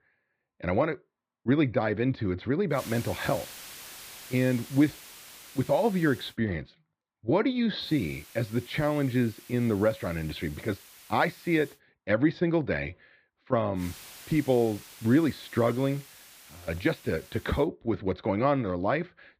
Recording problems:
muffled; very slightly; fading above 4 kHz
hiss; noticeable; from 2.5 to 6.5 s, from 8 to 12 s and from 14 to 18 s; 20 dB below the speech

